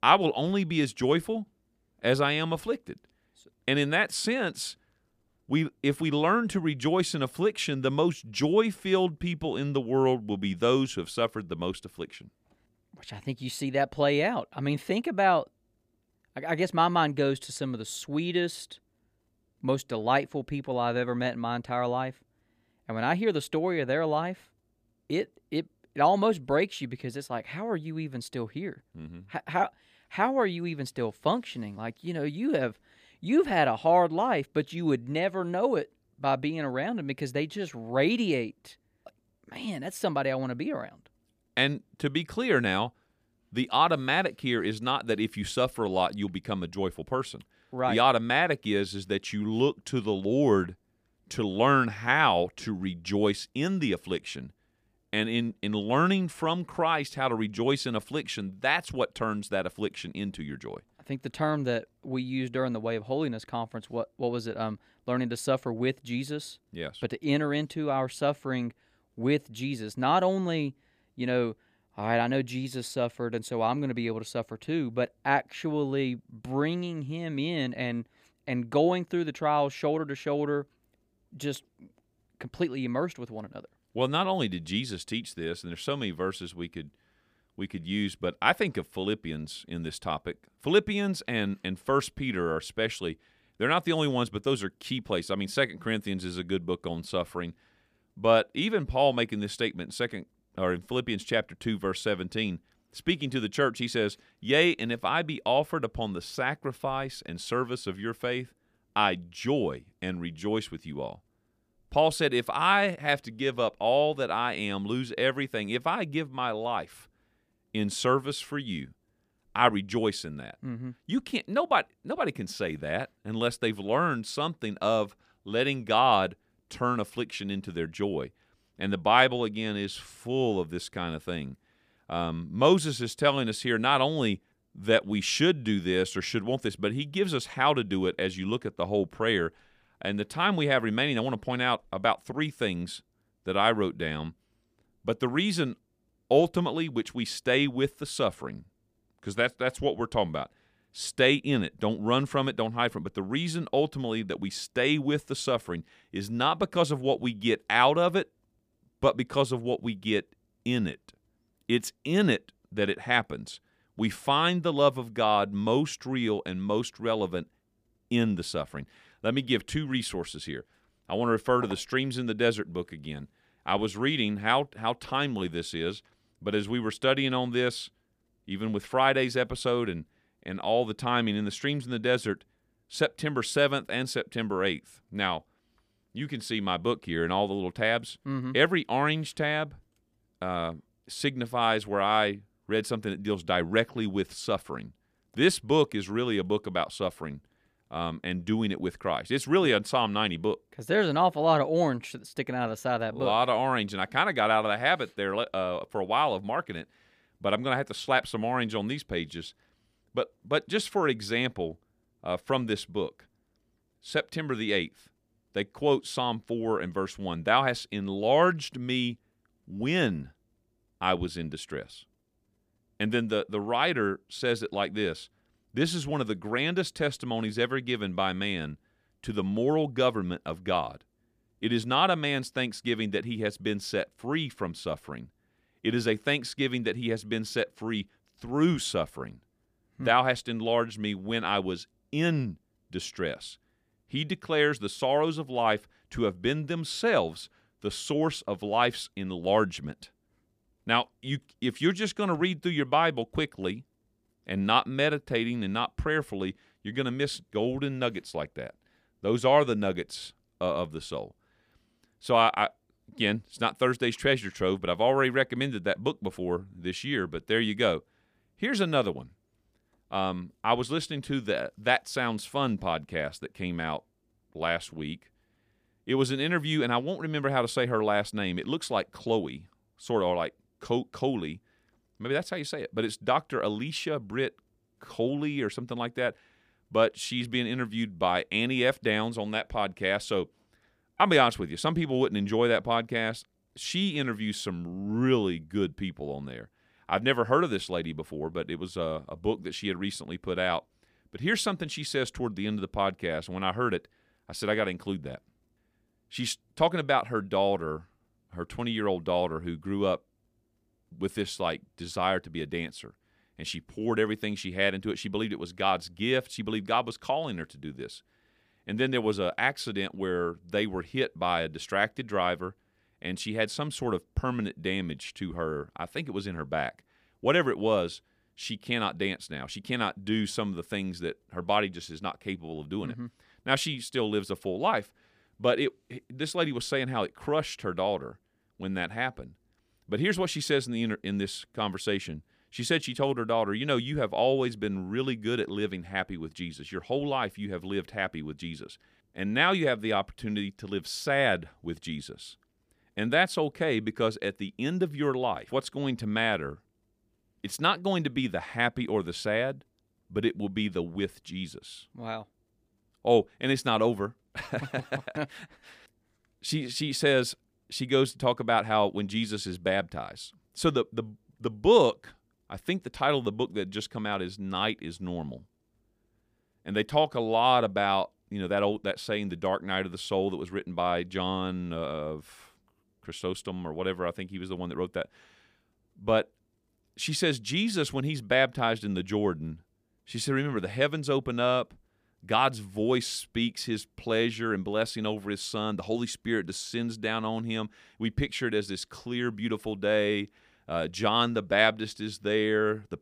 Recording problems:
none

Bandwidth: 15 kHz